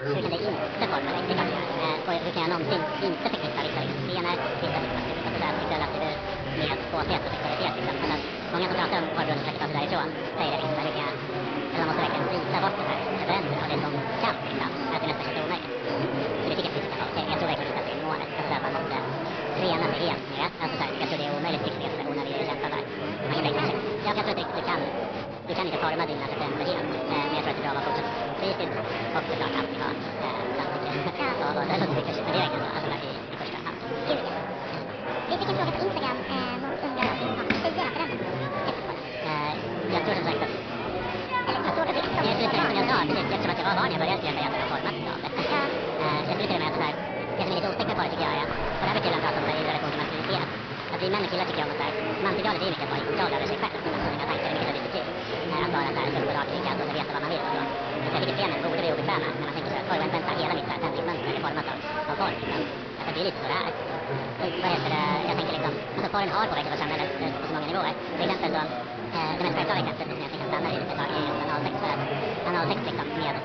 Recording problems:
wrong speed and pitch; too fast and too high; 1.5 times normal speed
high frequencies cut off; noticeable; nothing above 5.5 kHz
garbled, watery; slightly
chatter from many people; loud; throughout; as loud as the speech
rain or running water; faint; throughout; 25 dB below the speech

